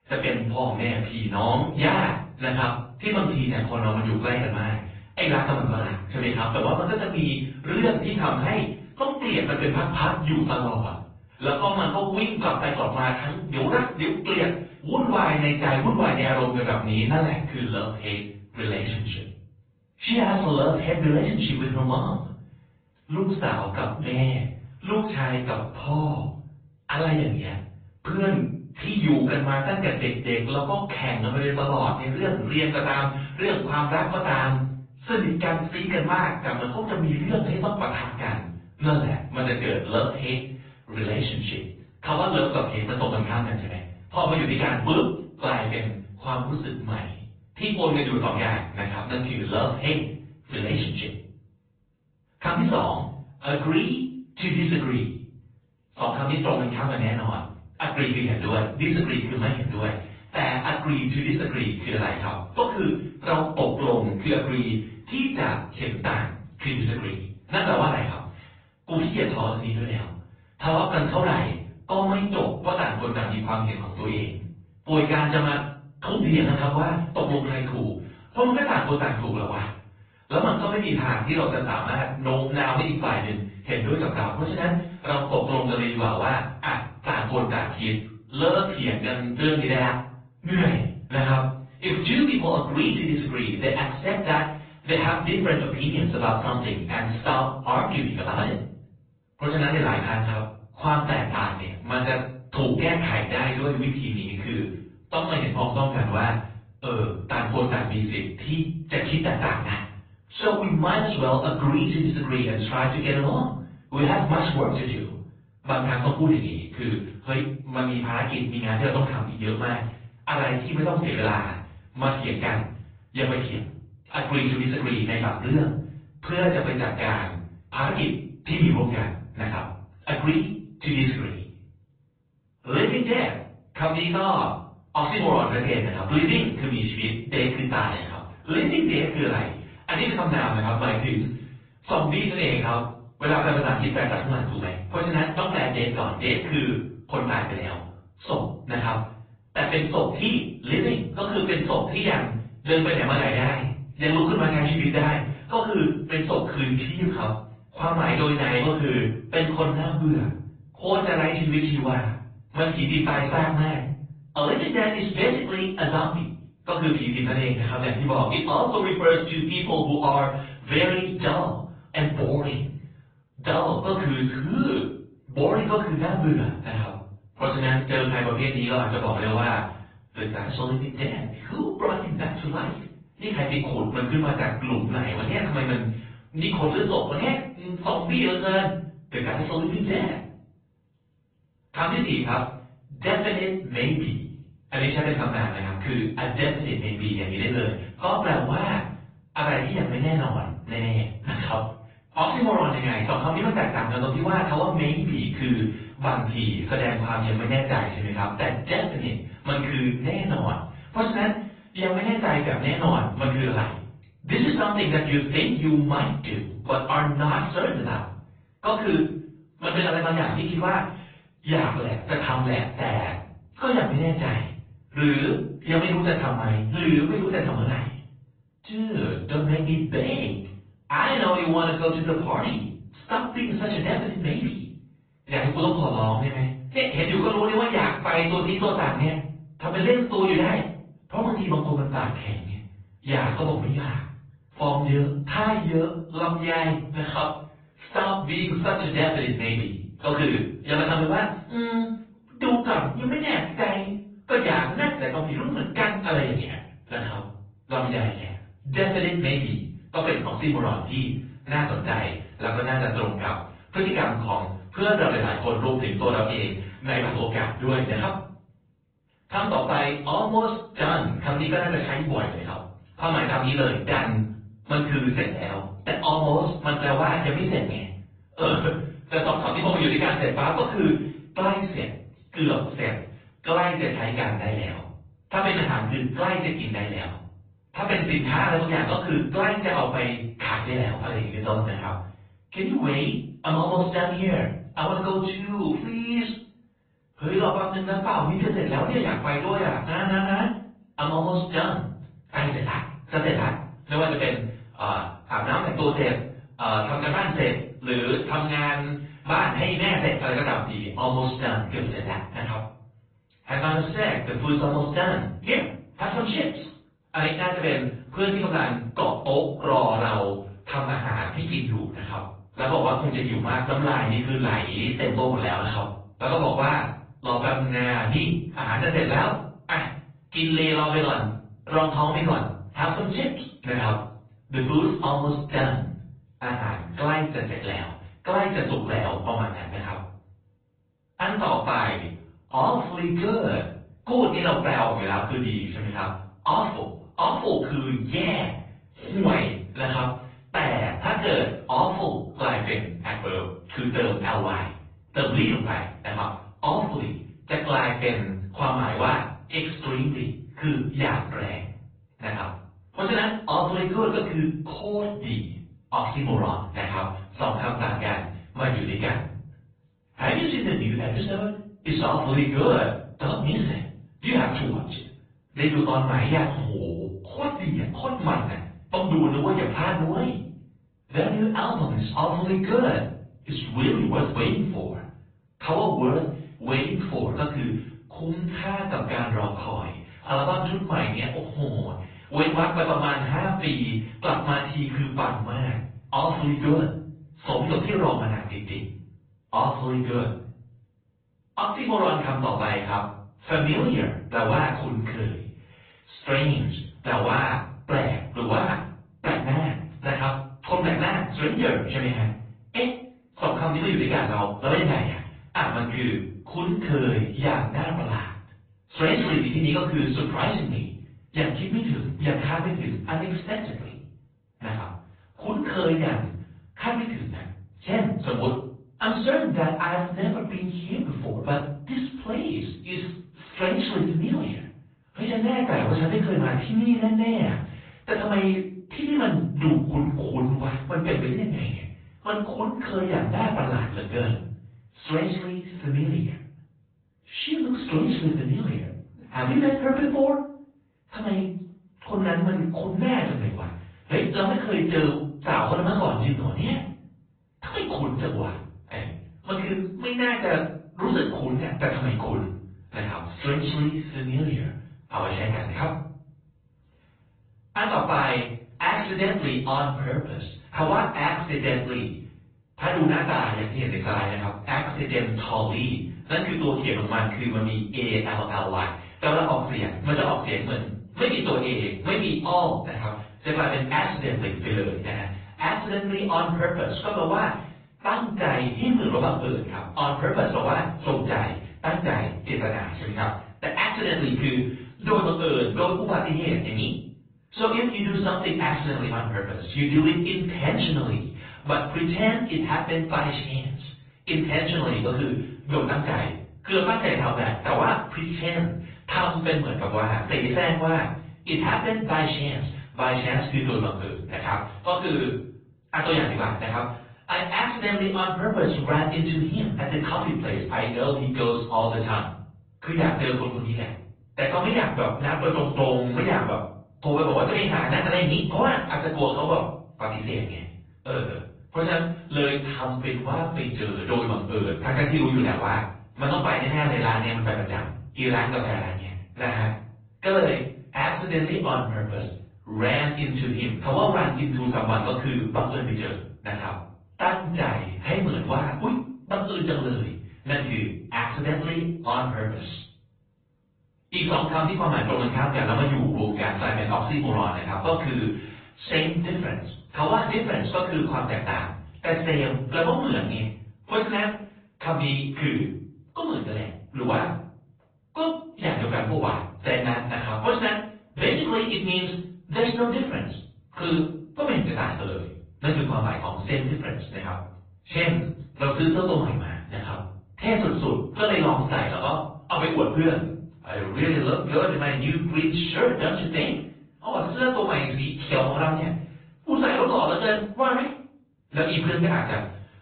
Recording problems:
off-mic speech; far
high frequencies cut off; severe; nothing above 4 kHz
room echo; noticeable; dies away in 0.5 s
garbled, watery; slightly

